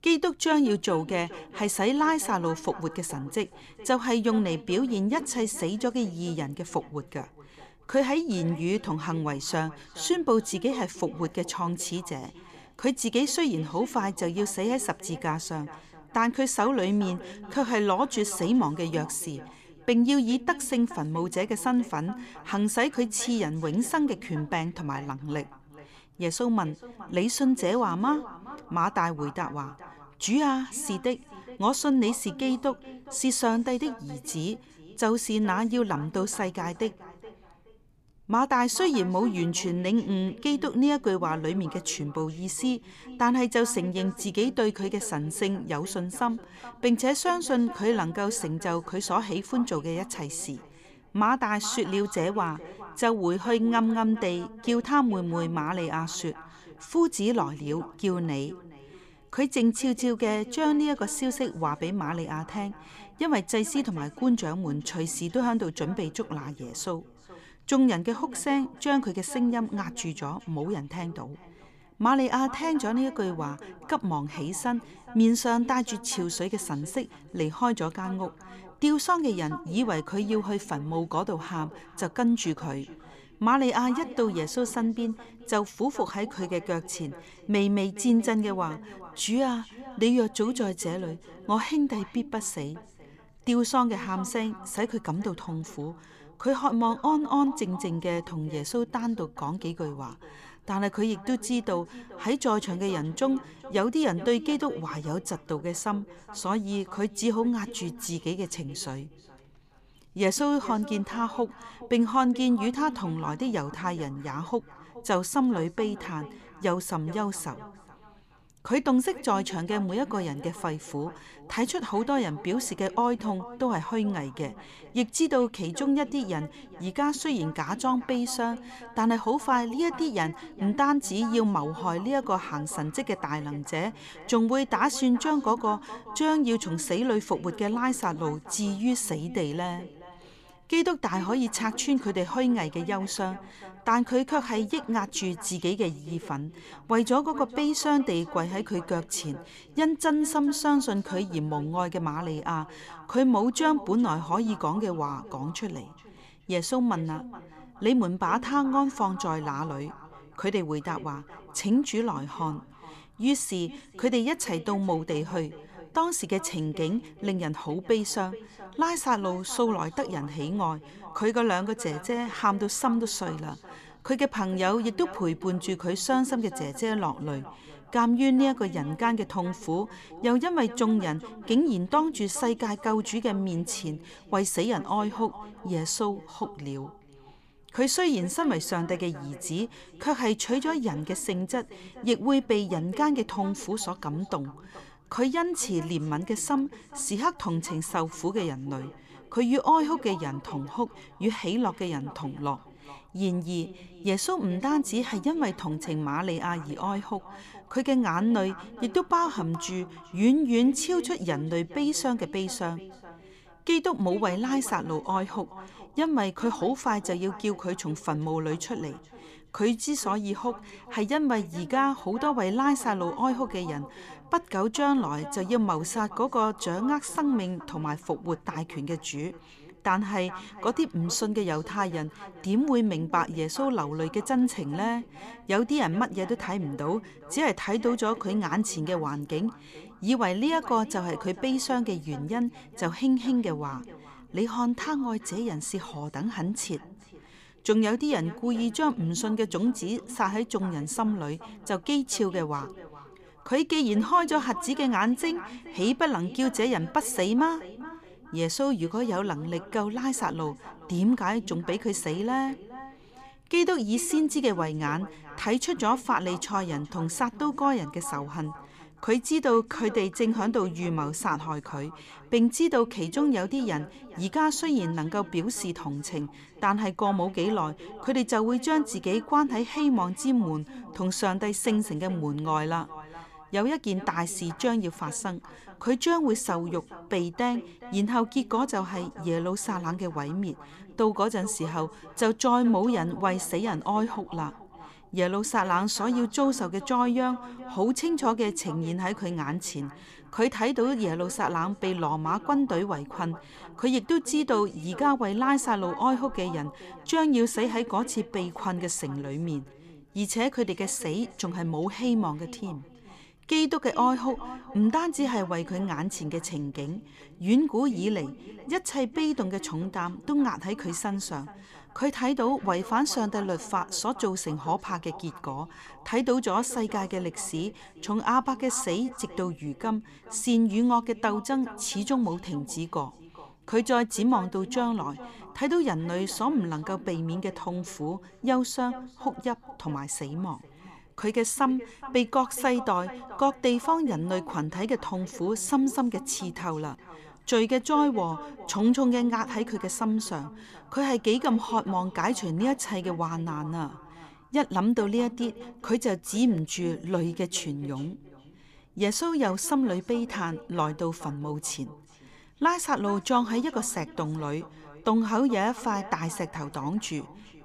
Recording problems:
echo of what is said; noticeable; throughout; 420 ms later, 20 dB below the speech

